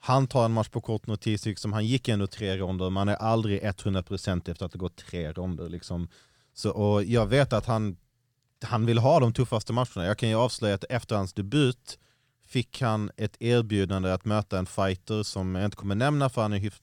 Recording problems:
none

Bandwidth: 17.5 kHz